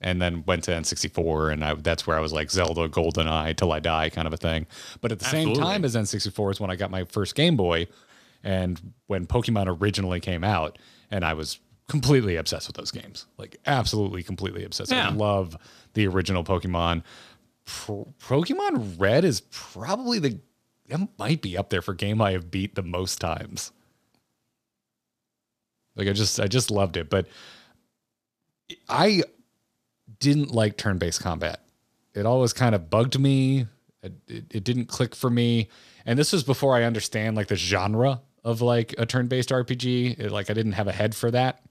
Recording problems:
none

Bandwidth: 14.5 kHz